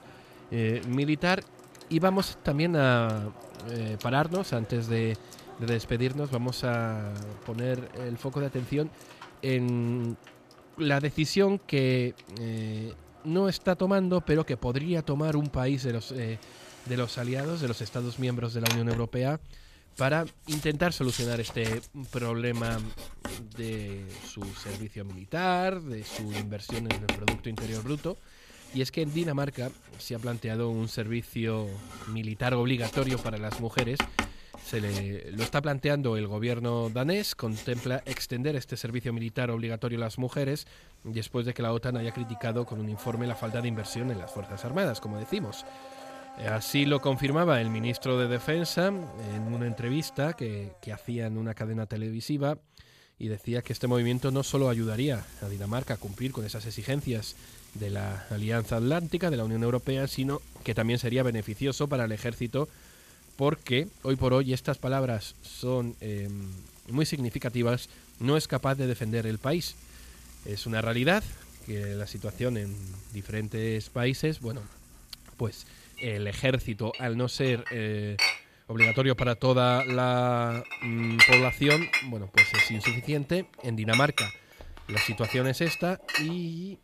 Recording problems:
household noises; loud; throughout; as loud as the speech

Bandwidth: 14.5 kHz